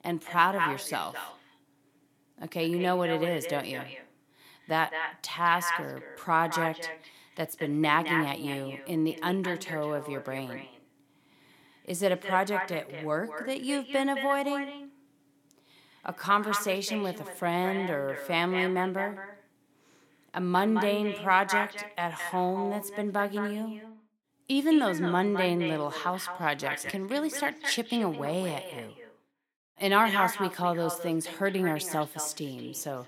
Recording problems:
echo of what is said; strong; throughout; 210 ms later, 7 dB below the speech

